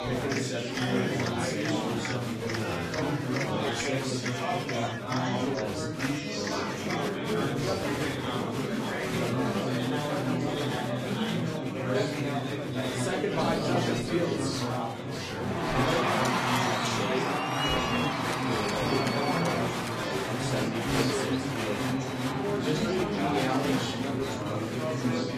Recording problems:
off-mic speech; far
room echo; slight; dies away in 0.4 s
garbled, watery; slightly; nothing above 14.5 kHz
chatter from many people; very loud; throughout; 6 dB above the speech

